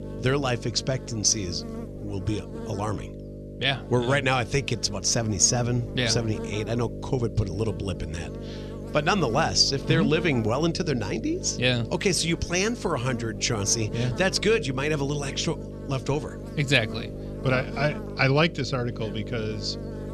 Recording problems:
electrical hum; noticeable; throughout; 50 Hz, 15 dB below the speech

